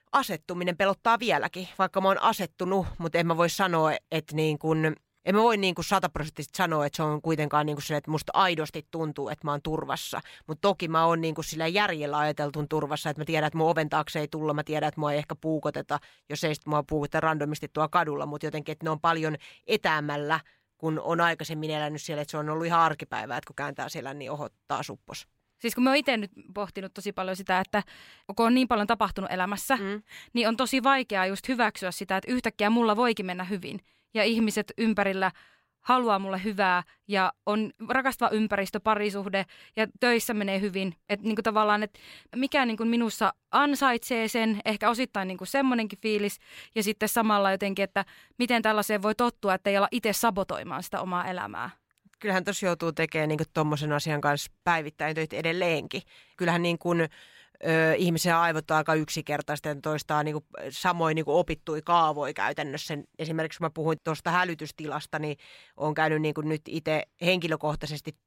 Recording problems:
none

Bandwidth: 16 kHz